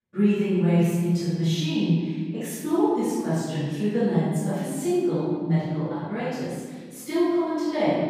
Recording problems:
room echo; strong; dies away in 1.6 s
off-mic speech; far

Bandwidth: 15 kHz